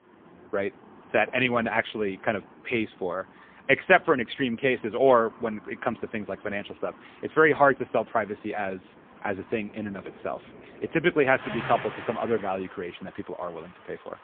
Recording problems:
phone-call audio; poor line; nothing above 3.5 kHz
traffic noise; noticeable; throughout; 20 dB below the speech

